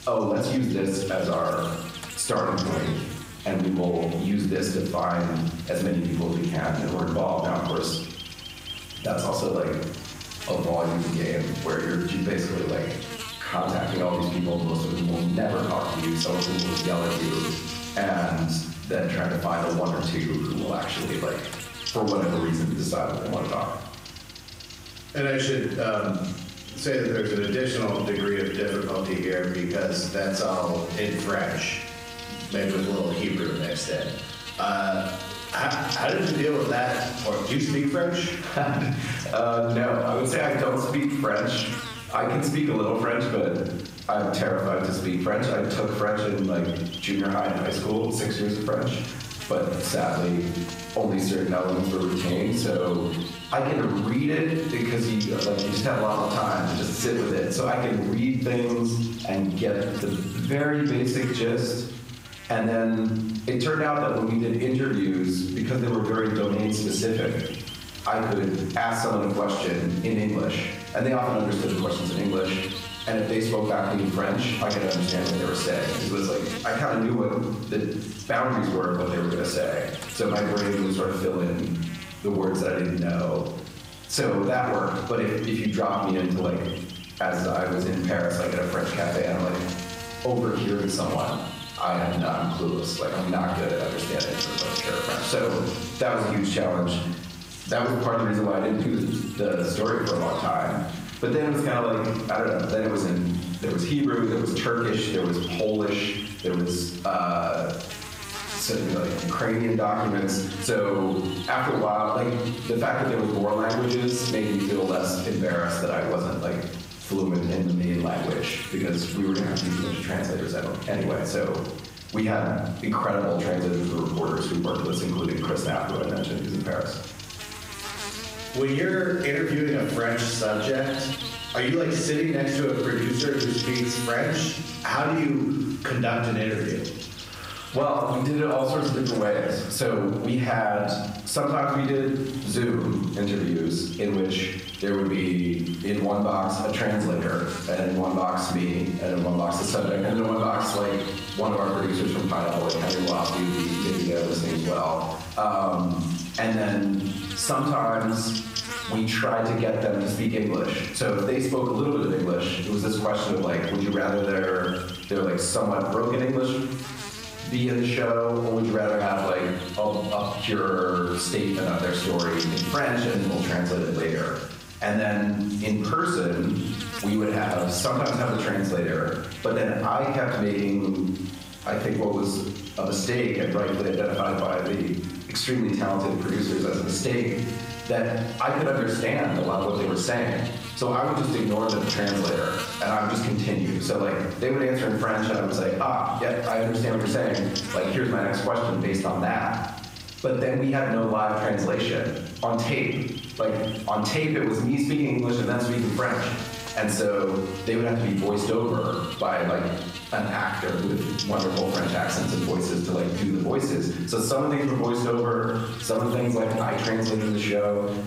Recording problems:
off-mic speech; far
squashed, flat; heavily
room echo; noticeable; dies away in 0.7 s
electrical hum; noticeable; throughout; 50 Hz, 10 dB below the speech

